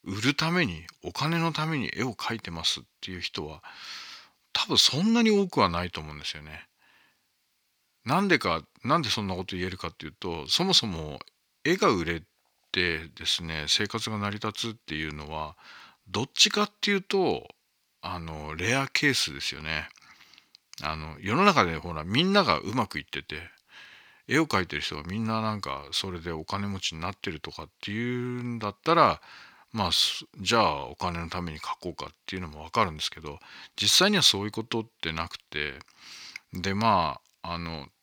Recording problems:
thin; somewhat; fading below 950 Hz

